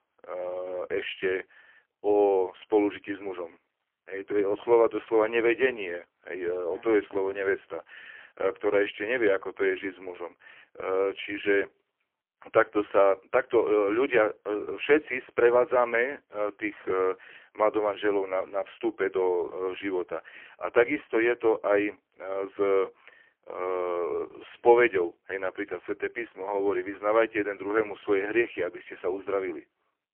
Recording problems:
phone-call audio; poor line; nothing above 3 kHz

